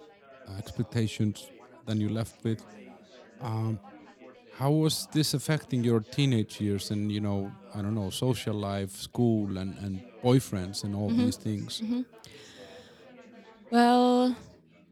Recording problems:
background chatter; faint; throughout; 4 voices, 25 dB below the speech

